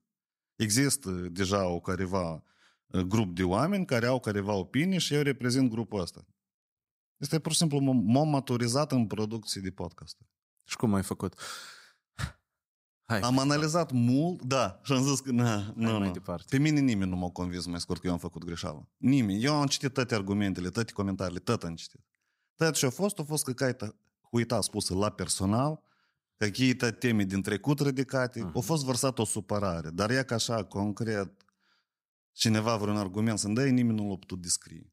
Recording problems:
uneven, jittery; strongly; from 3 to 33 s

